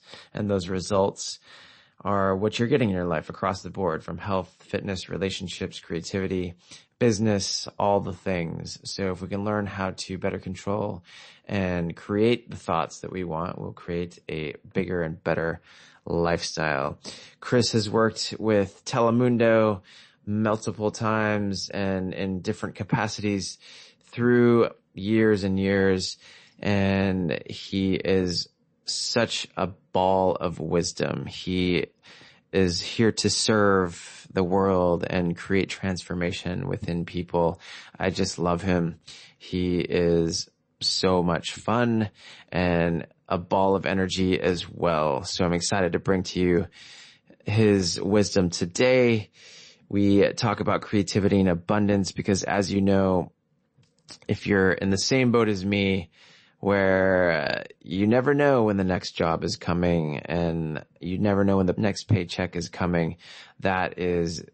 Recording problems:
garbled, watery; slightly; nothing above 8 kHz

